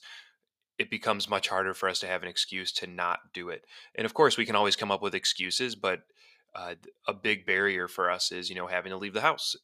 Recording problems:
thin; somewhat; fading below 1 kHz

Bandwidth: 15 kHz